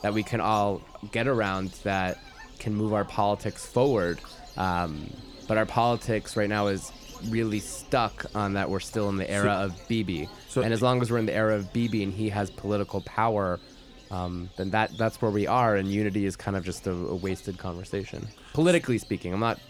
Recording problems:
animal sounds; noticeable; throughout; 20 dB below the speech

